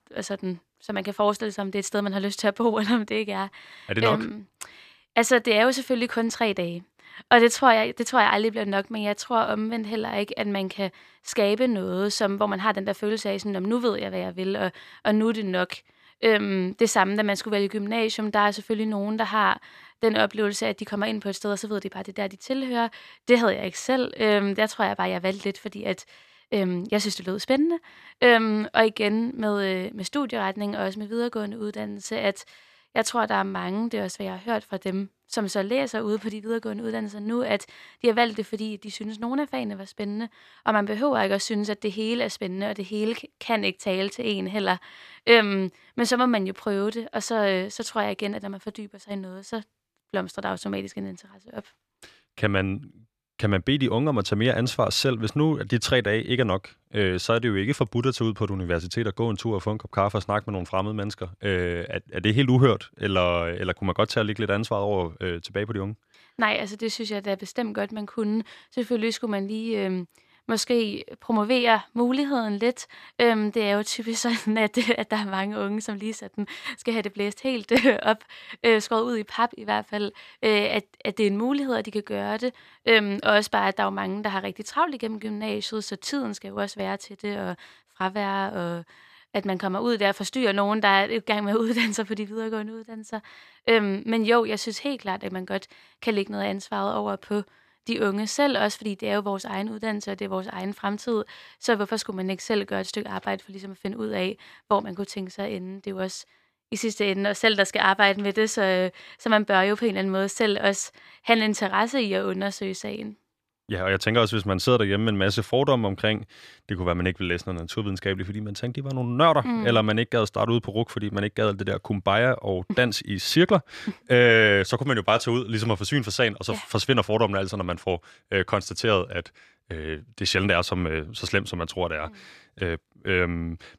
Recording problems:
none

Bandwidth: 14.5 kHz